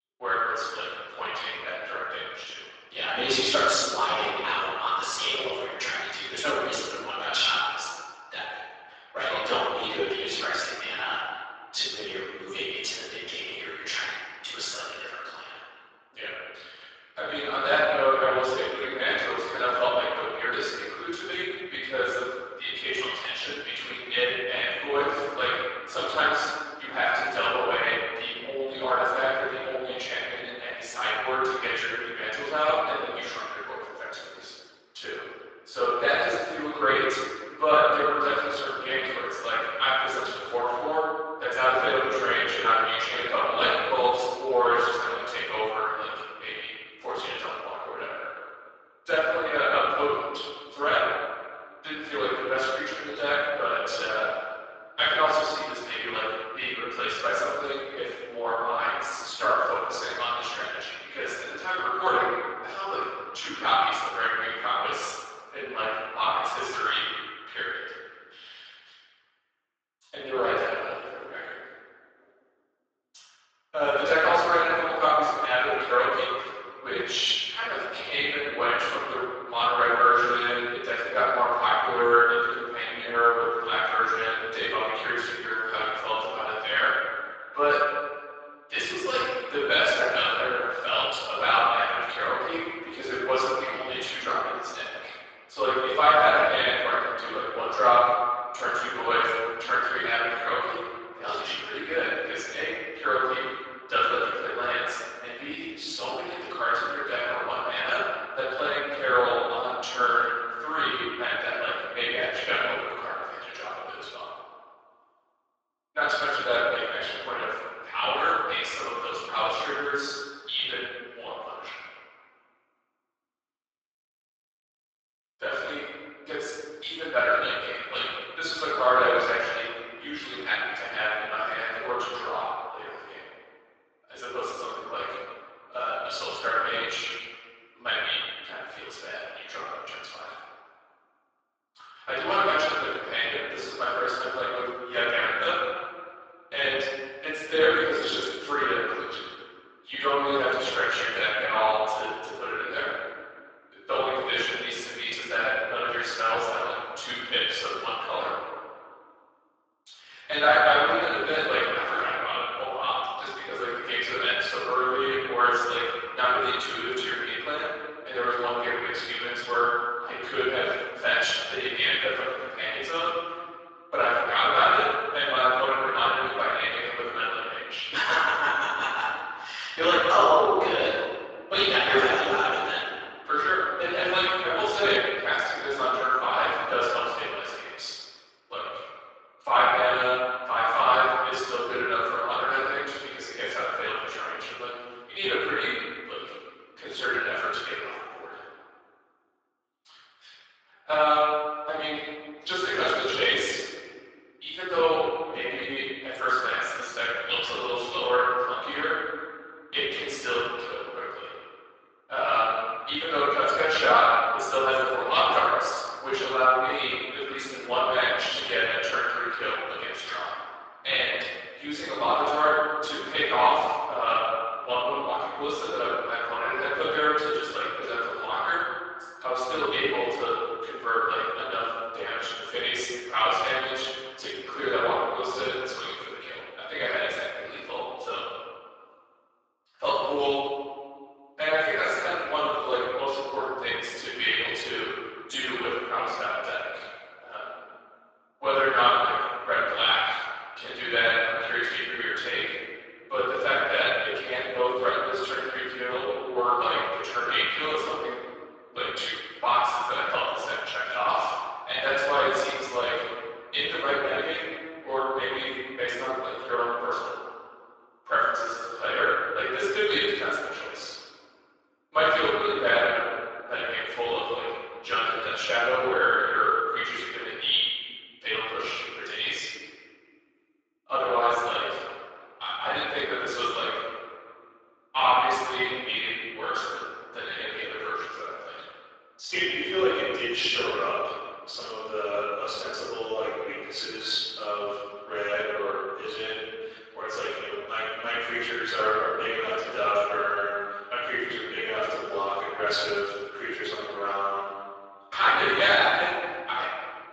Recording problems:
room echo; strong; dies away in 1.6 s
off-mic speech; far
thin; very; fading below 400 Hz
garbled, watery; slightly; nothing above 7.5 kHz

